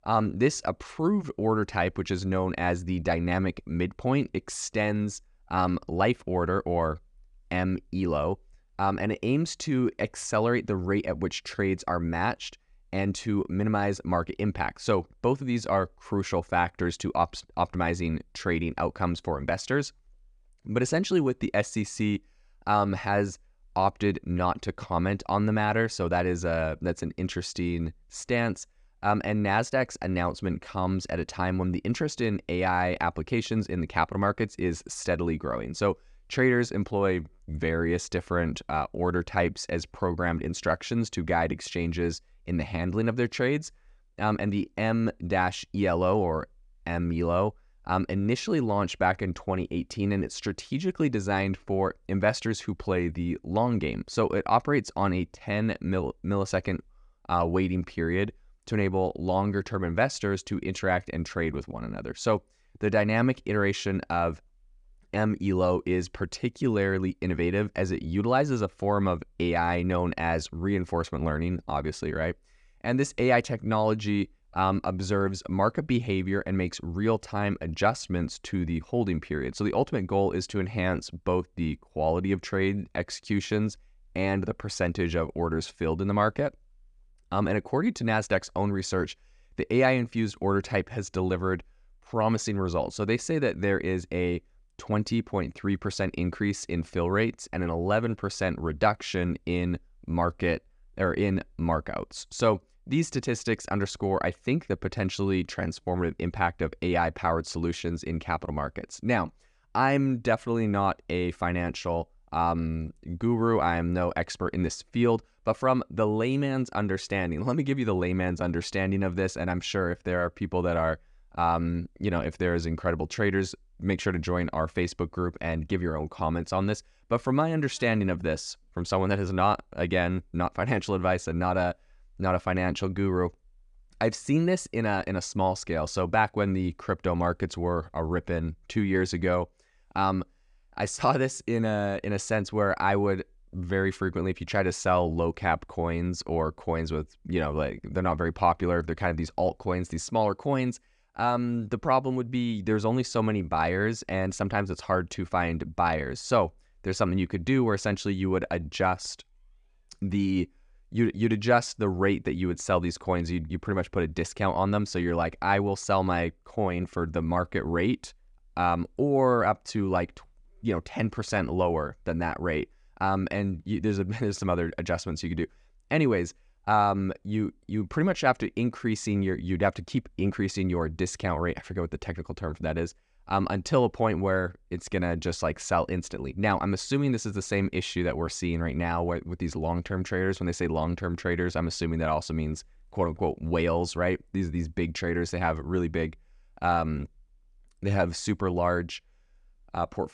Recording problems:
none

